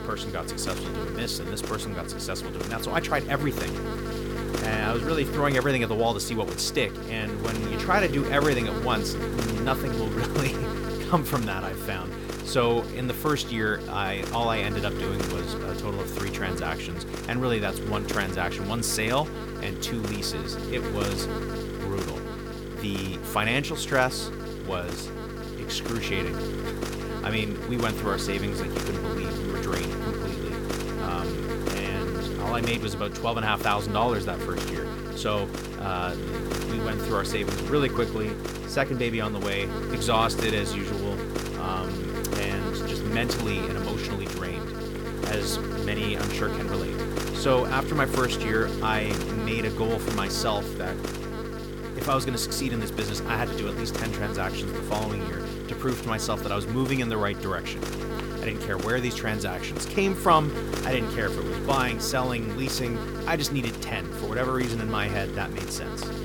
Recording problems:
electrical hum; loud; throughout; 50 Hz, 5 dB below the speech

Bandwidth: 17.5 kHz